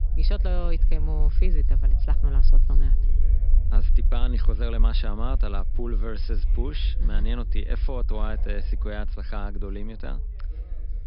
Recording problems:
high frequencies cut off; noticeable; nothing above 5.5 kHz
low rumble; noticeable; throughout; 10 dB below the speech
background chatter; faint; throughout; 2 voices, 20 dB below the speech

